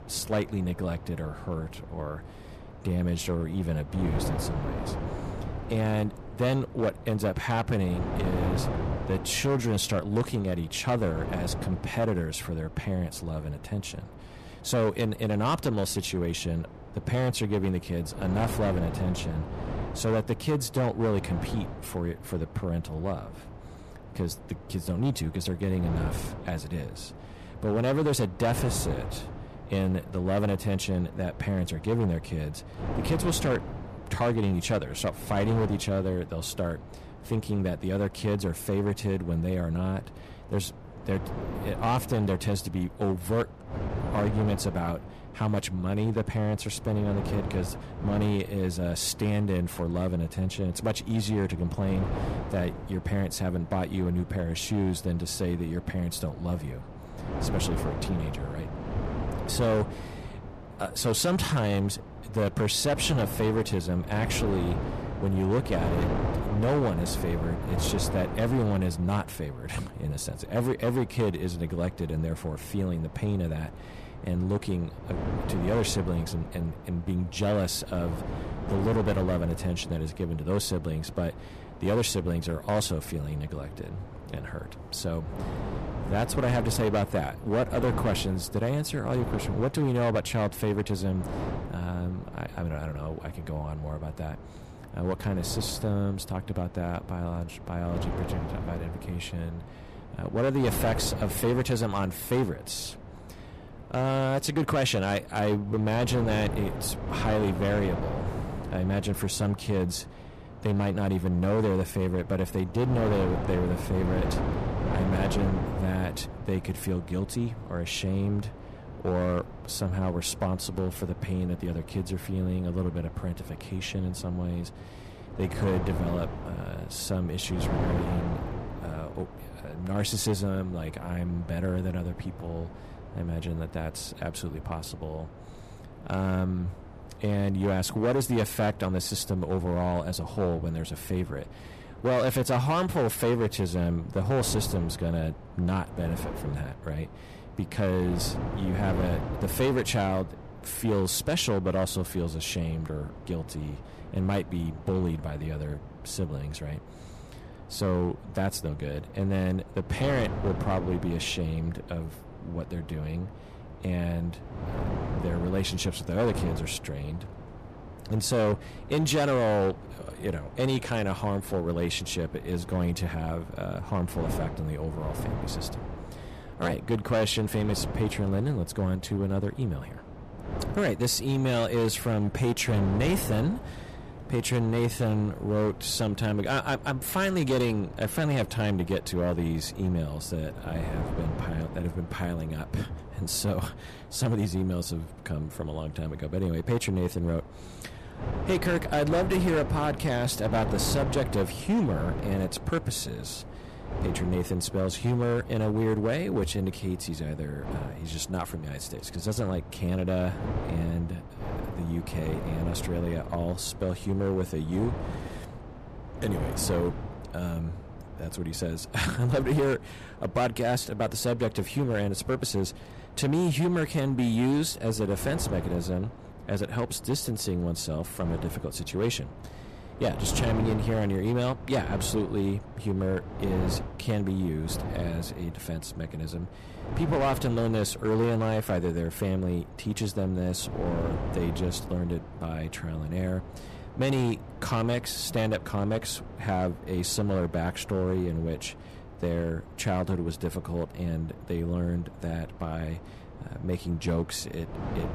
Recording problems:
distortion; slight; 6% of the sound clipped
wind noise on the microphone; occasional gusts; 10 dB below the speech

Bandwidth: 14.5 kHz